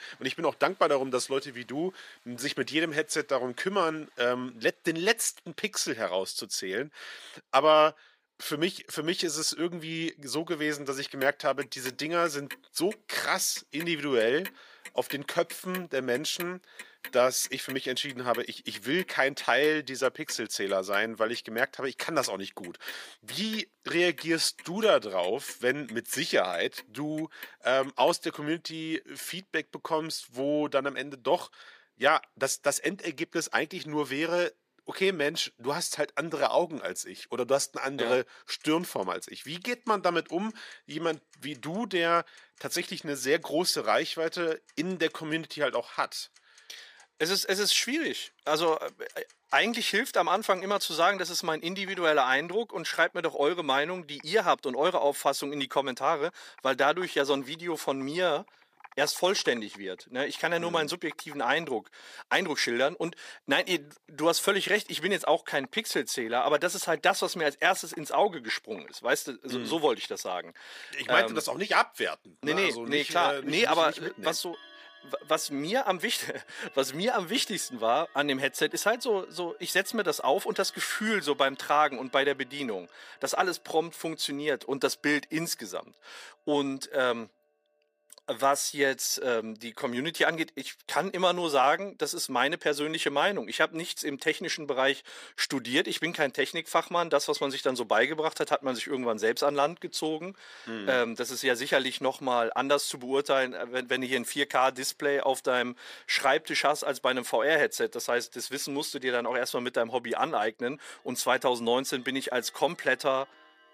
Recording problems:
thin; somewhat; fading below 400 Hz
household noises; faint; throughout; 20 dB below the speech

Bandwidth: 15 kHz